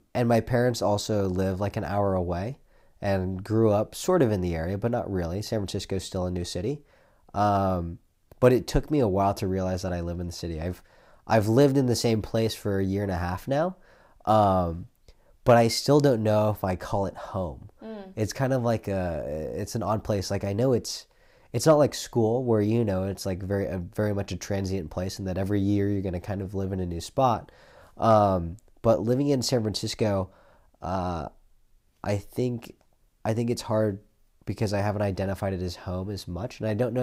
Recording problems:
abrupt cut into speech; at the end

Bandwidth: 15.5 kHz